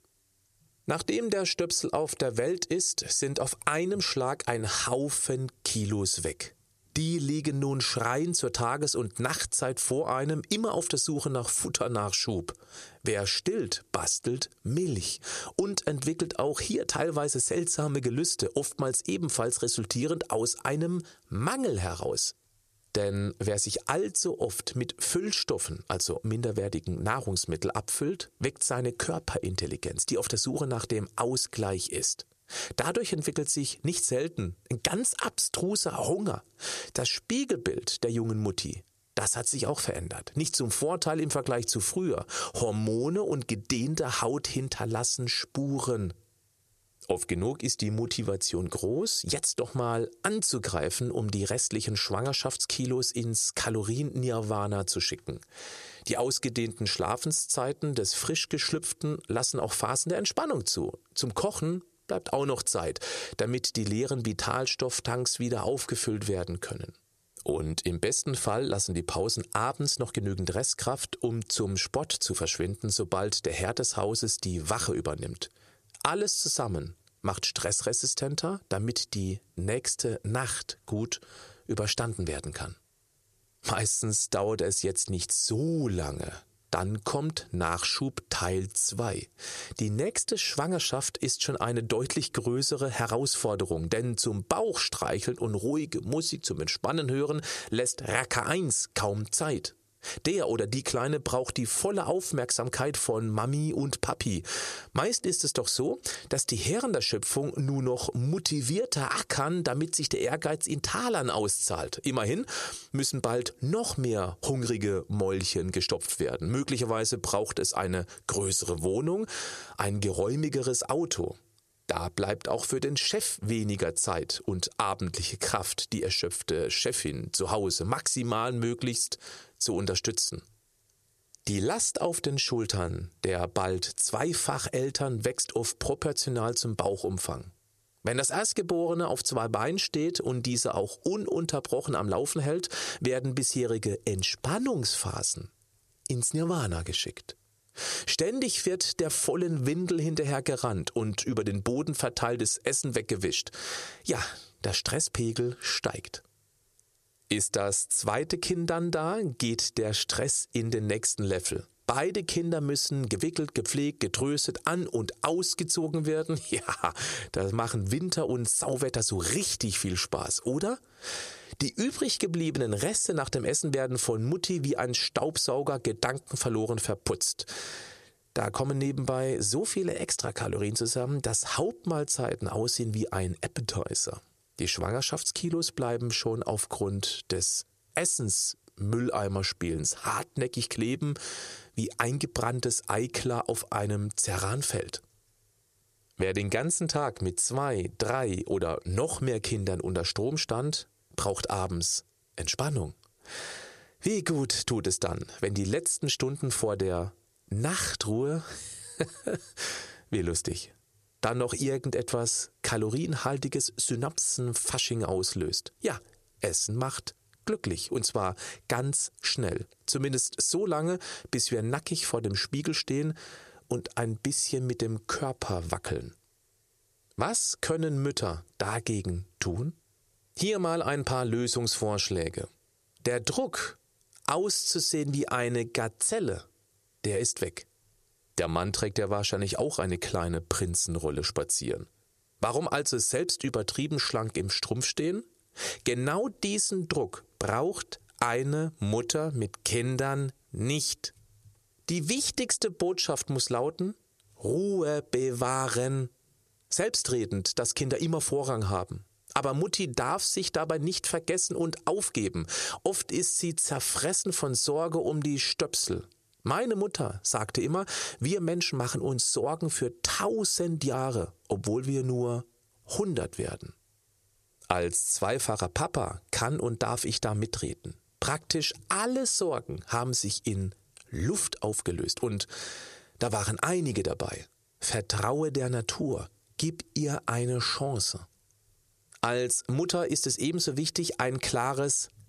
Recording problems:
squashed, flat; heavily

